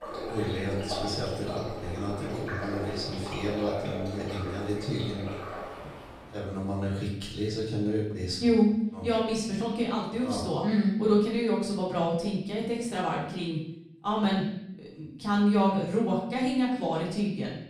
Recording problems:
off-mic speech; far
room echo; noticeable; dies away in 0.7 s
rain or running water; loud; until 6.5 s; 8 dB below the speech

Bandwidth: 15 kHz